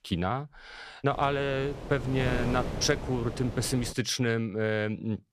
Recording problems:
wind noise on the microphone; heavy; from 1 to 4 s; 10 dB below the speech

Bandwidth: 14 kHz